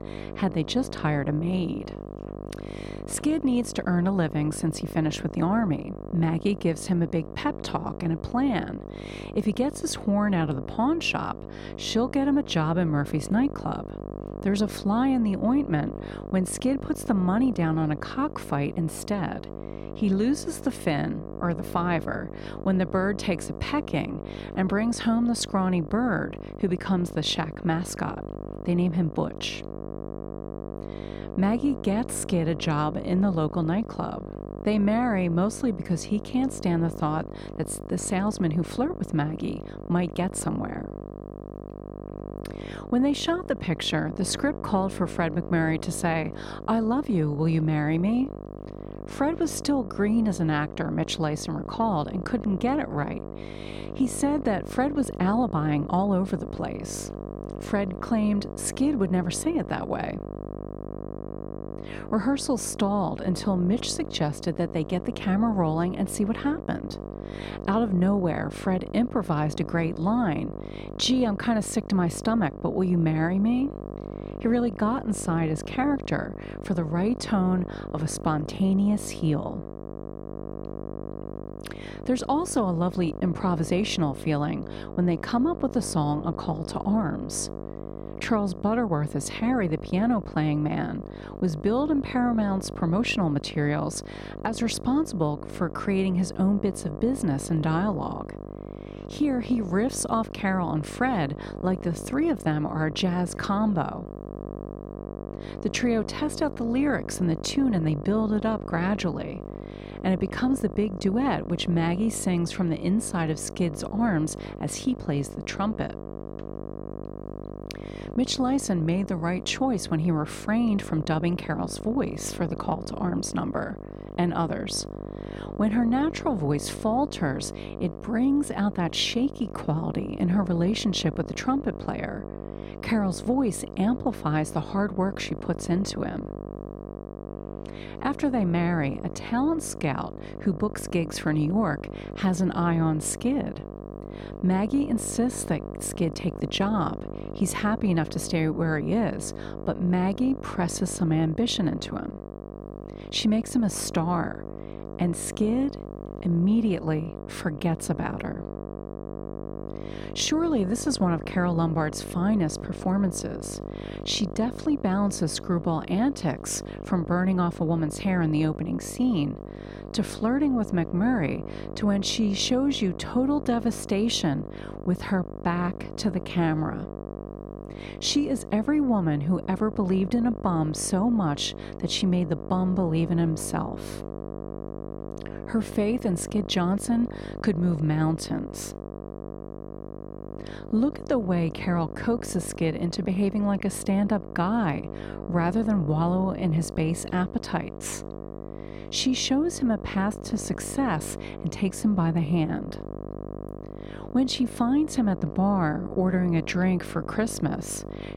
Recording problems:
electrical hum; noticeable; throughout; 50 Hz, 10 dB below the speech

